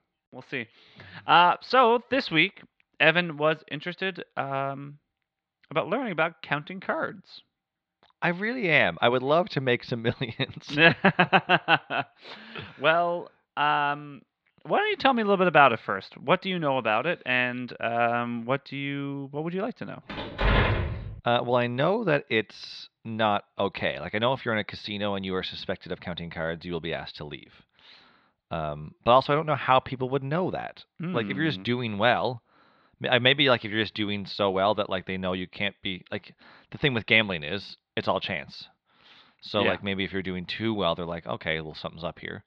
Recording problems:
muffled; slightly; fading above 4 kHz
door banging; loud; at 20 s; peak 3 dB above the speech

